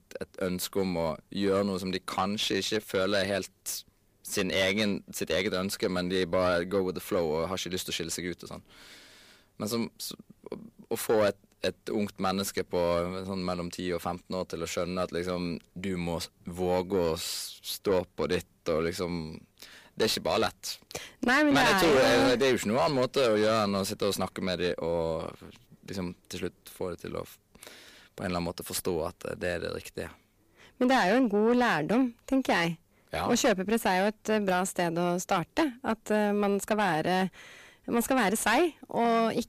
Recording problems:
distortion; heavy; 6 dB below the speech

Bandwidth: 15 kHz